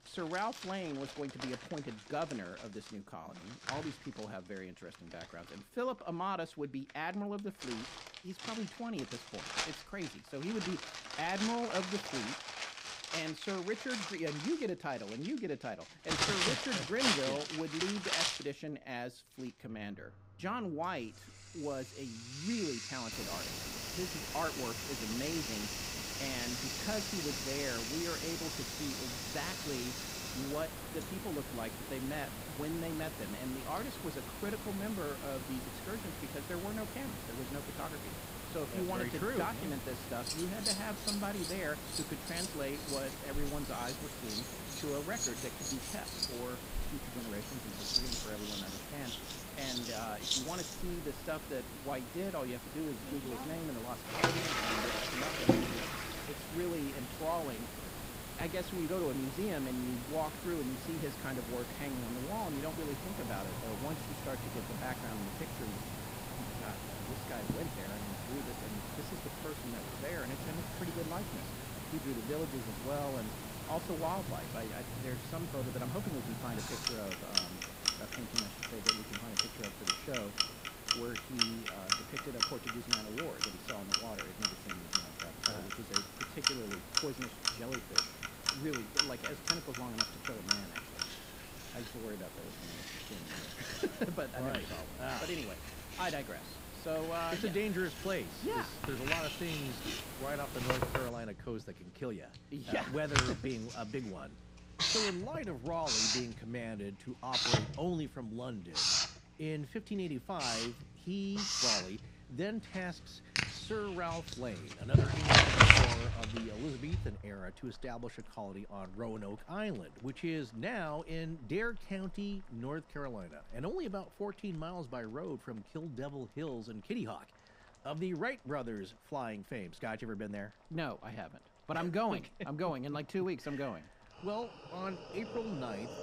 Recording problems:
household noises; very loud; throughout; 5 dB above the speech
hiss; loud; from 23 s to 1:41; 4 dB below the speech

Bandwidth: 15.5 kHz